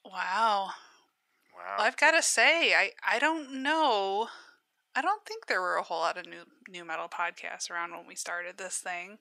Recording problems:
thin; very; fading below 750 Hz

